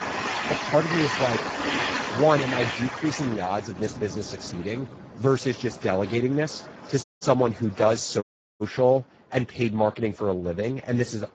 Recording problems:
garbled, watery; badly; nothing above 7.5 kHz
train or aircraft noise; loud; throughout; 4 dB below the speech
audio cutting out; at 7 s and at 8 s

